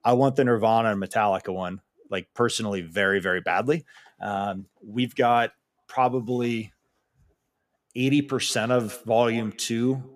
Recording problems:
echo of what is said; faint; from 7.5 s on; 170 ms later, 20 dB below the speech

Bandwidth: 15 kHz